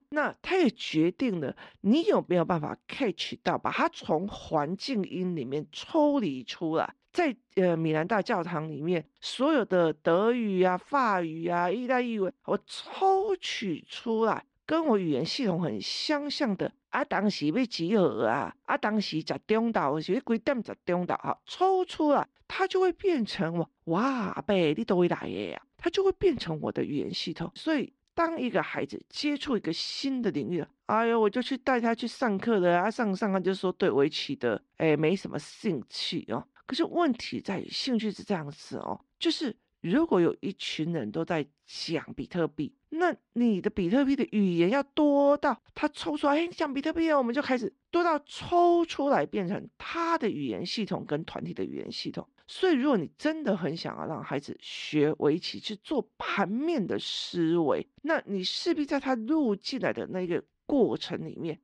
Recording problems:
muffled; slightly; fading above 3.5 kHz

